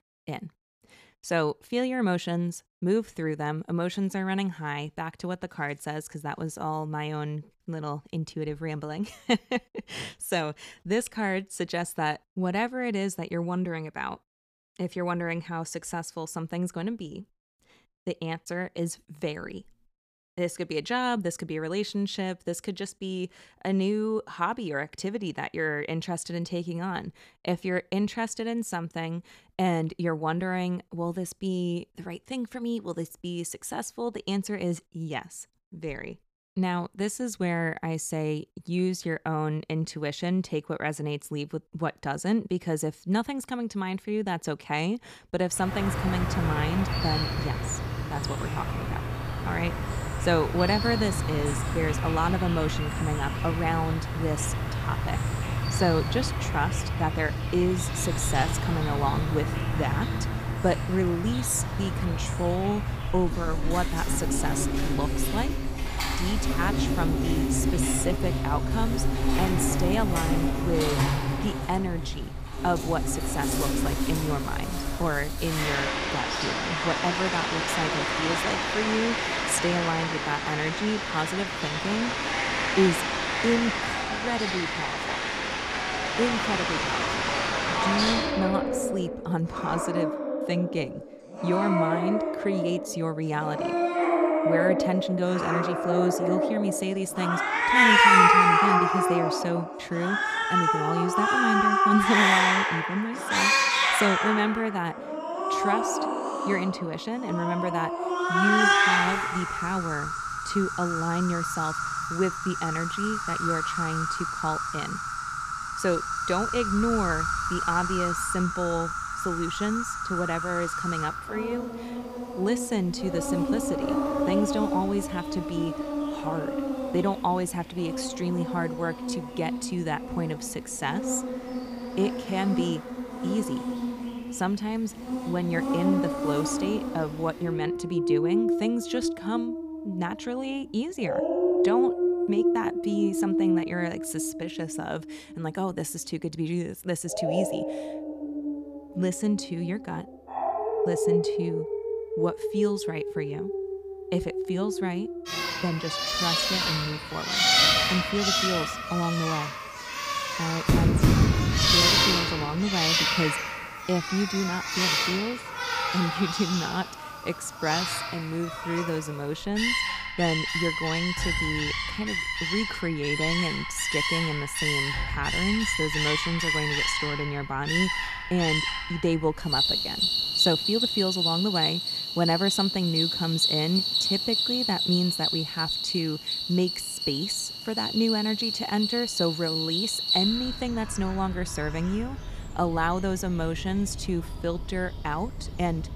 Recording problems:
animal sounds; very loud; from 46 s on; 3 dB above the speech

